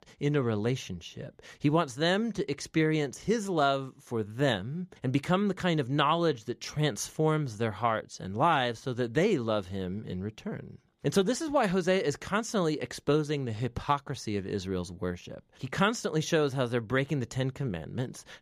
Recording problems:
none

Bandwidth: 14.5 kHz